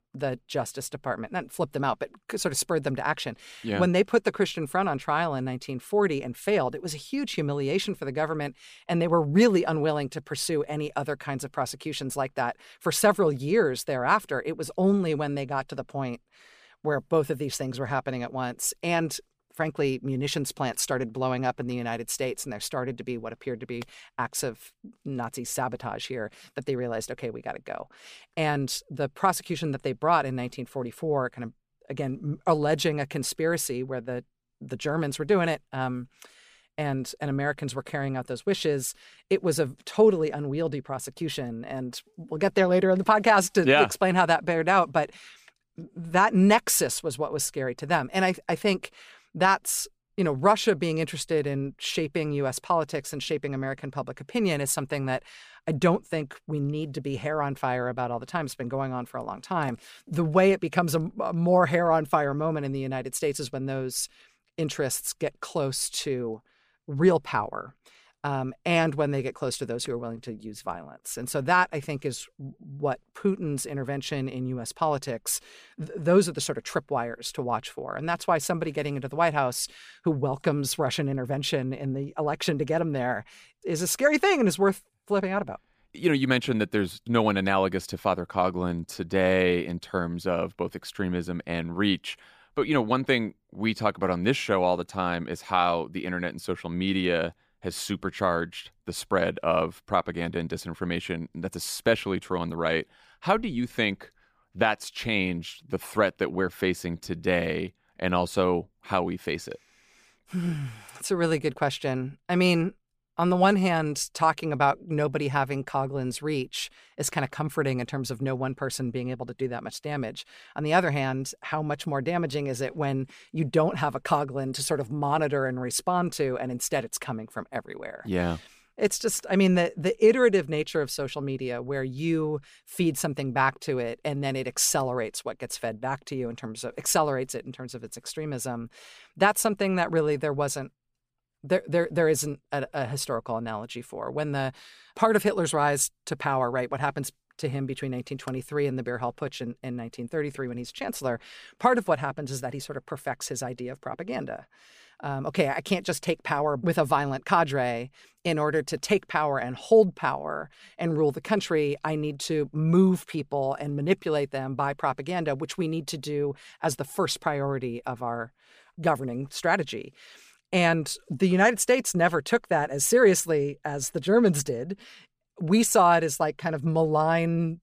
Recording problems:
none

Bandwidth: 15 kHz